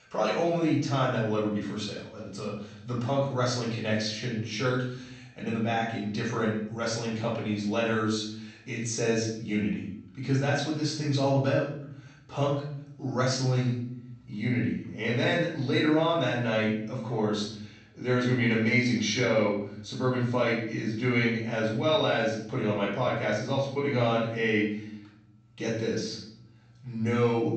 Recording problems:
off-mic speech; far
room echo; noticeable; dies away in 0.7 s
high frequencies cut off; noticeable; nothing above 8 kHz

